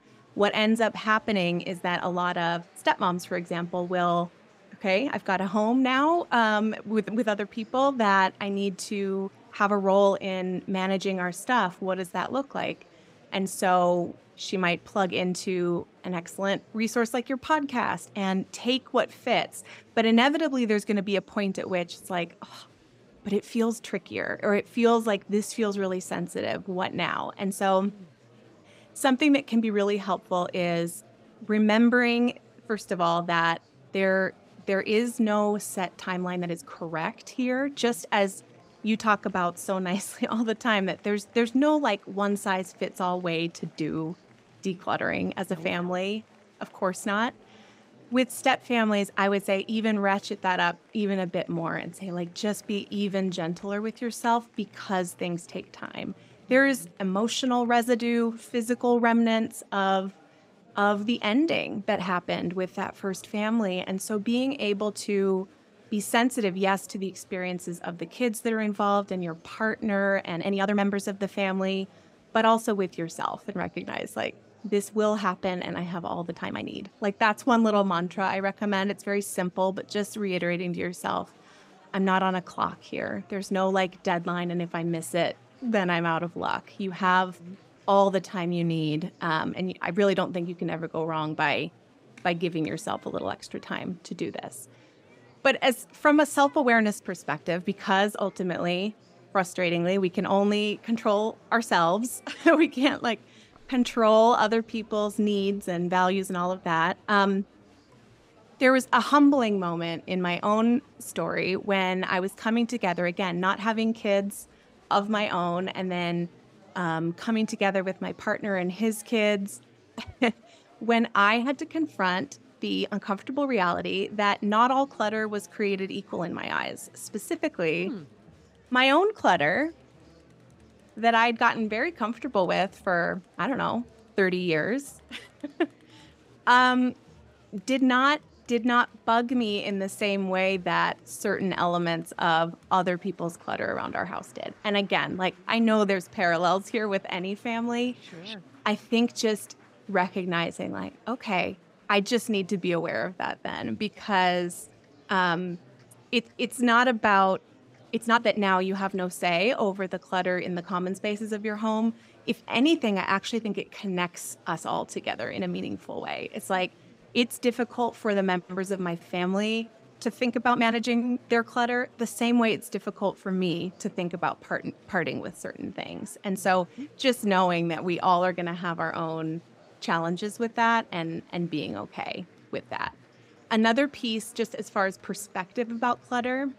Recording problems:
murmuring crowd; faint; throughout; 30 dB below the speech
uneven, jittery; strongly; from 11 s to 2:51

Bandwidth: 15.5 kHz